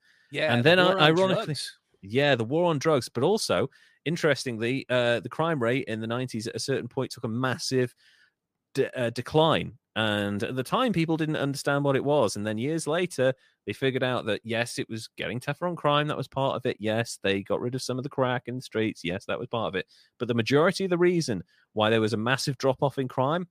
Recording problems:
none

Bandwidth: 15 kHz